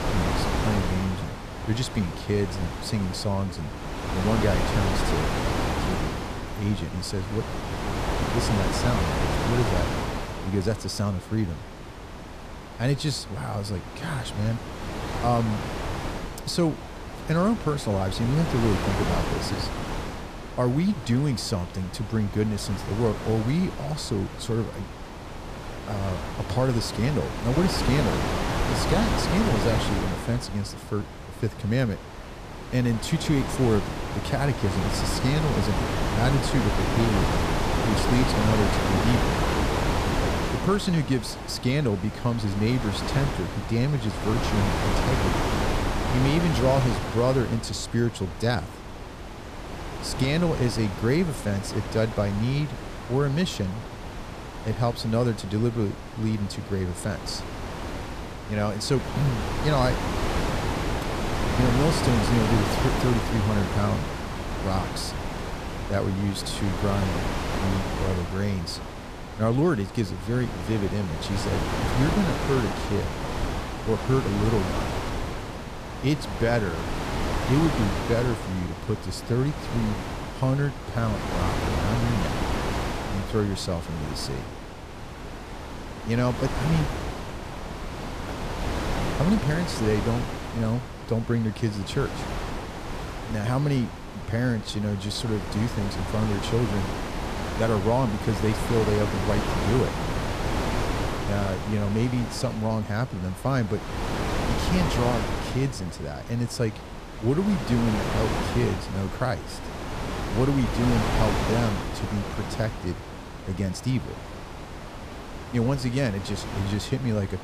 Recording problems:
wind noise on the microphone; heavy; 1 dB below the speech

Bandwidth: 14.5 kHz